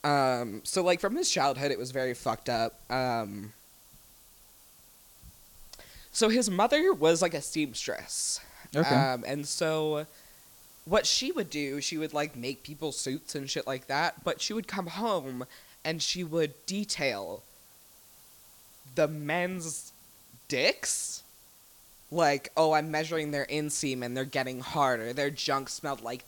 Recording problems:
hiss; faint; throughout; 25 dB below the speech

